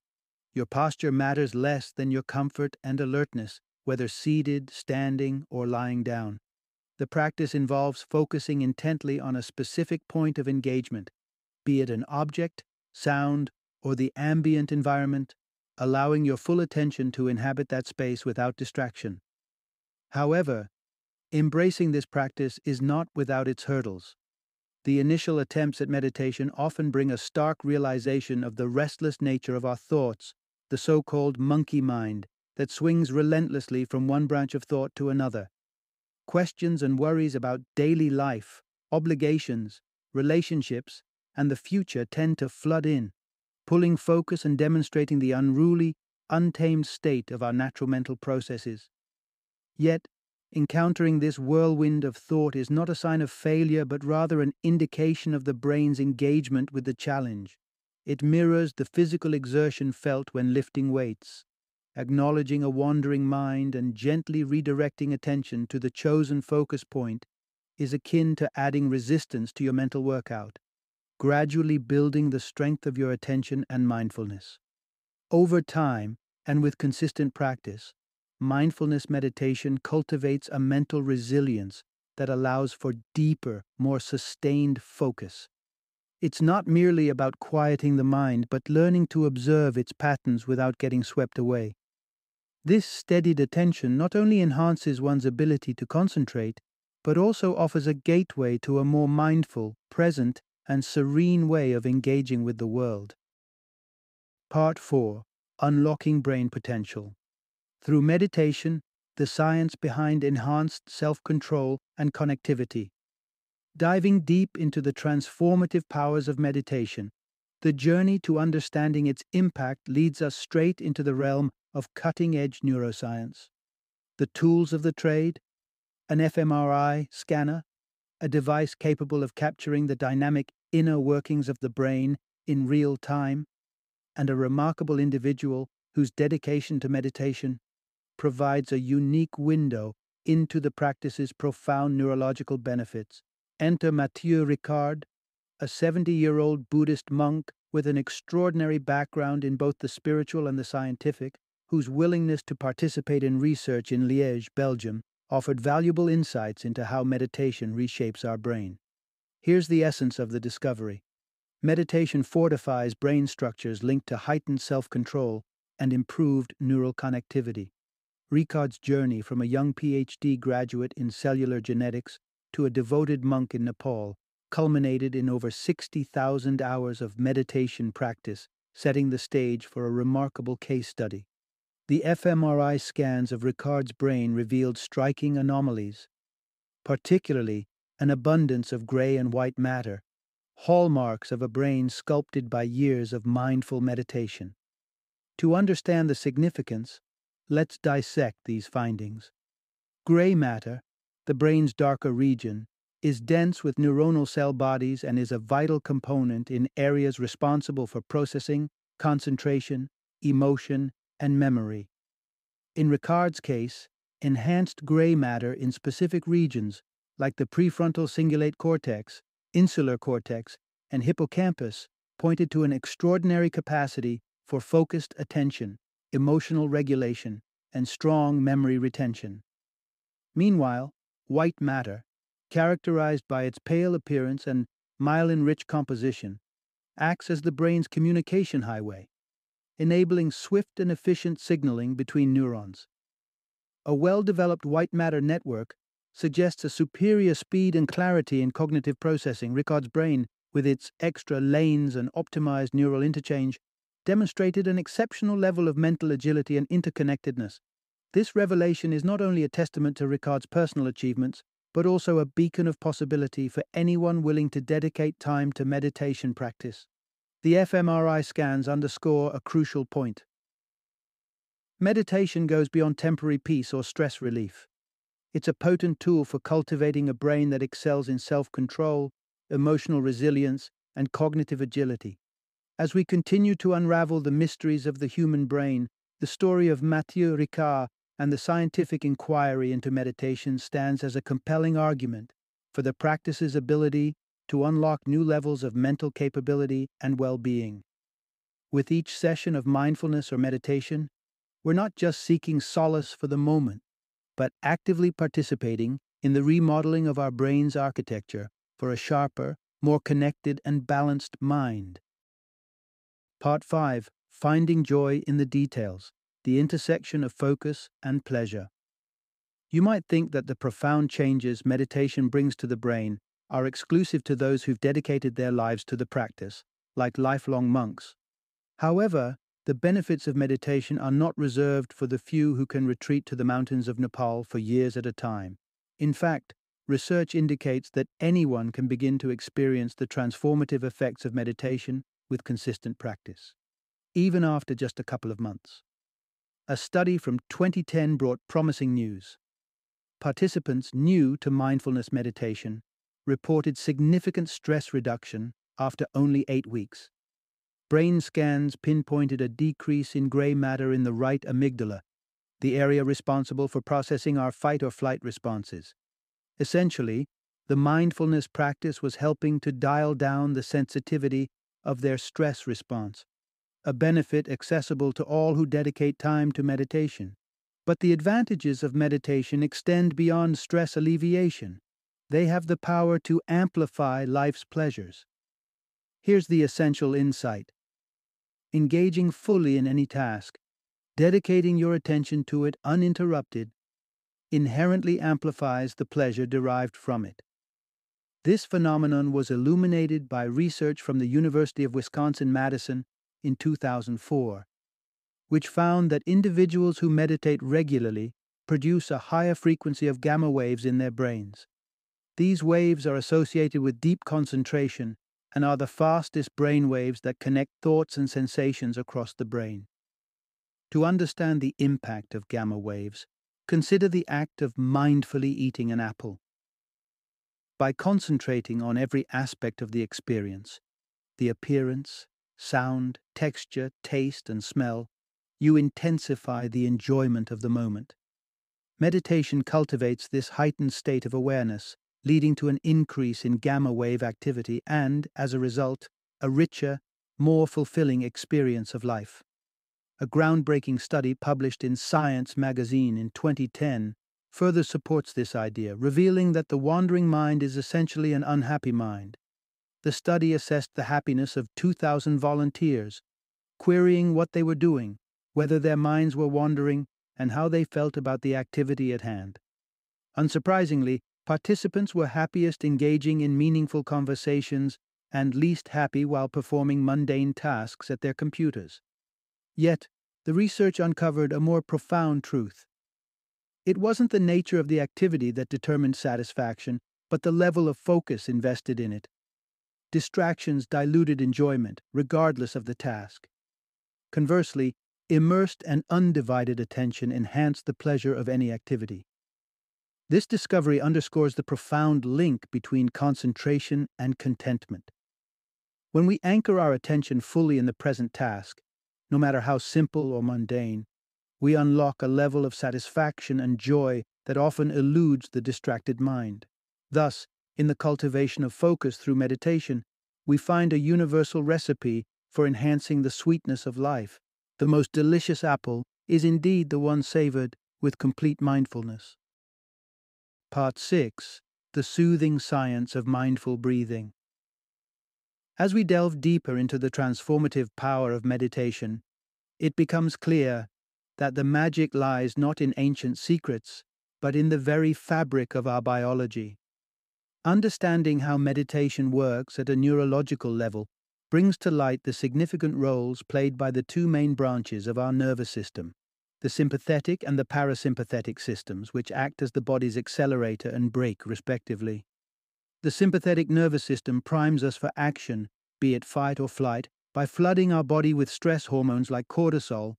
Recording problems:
none

